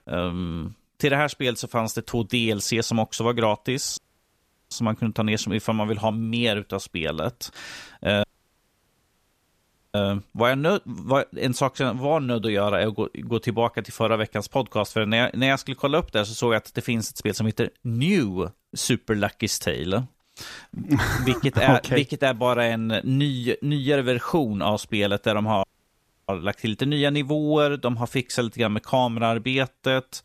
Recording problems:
audio cutting out; at 4 s for 0.5 s, at 8 s for 1.5 s and at 26 s for 0.5 s

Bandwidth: 14.5 kHz